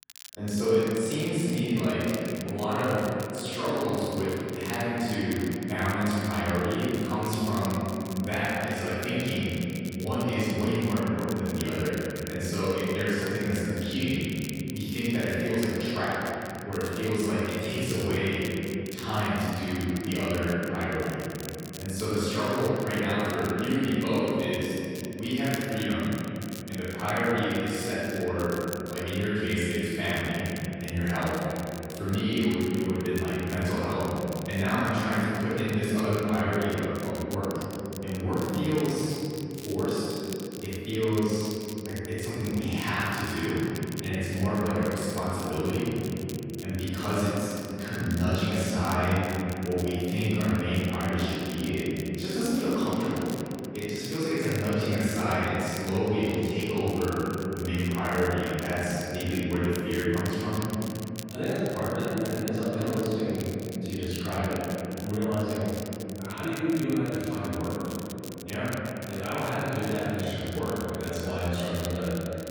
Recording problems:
room echo; strong; dies away in 3 s
off-mic speech; far
crackle, like an old record; very faint; 15 dB below the speech

